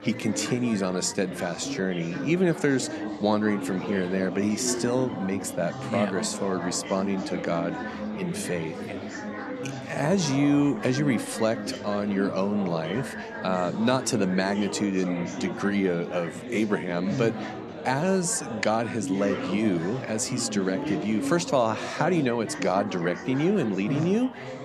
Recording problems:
chatter from many people; loud; throughout; 7 dB below the speech

